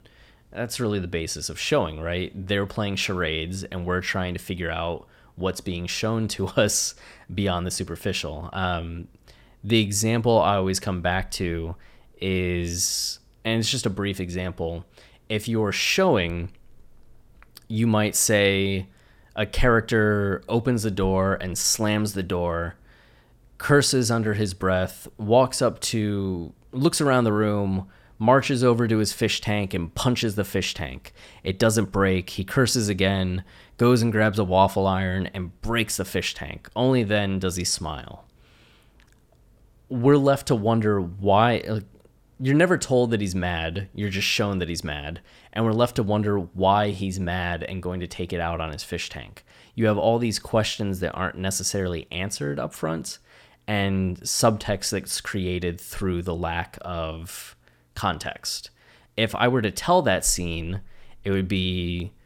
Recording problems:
none

